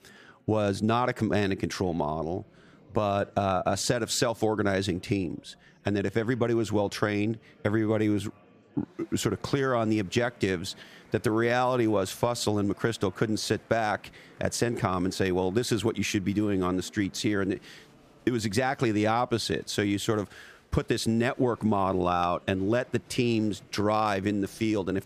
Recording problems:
chatter from many people; faint; throughout; 30 dB below the speech

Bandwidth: 14.5 kHz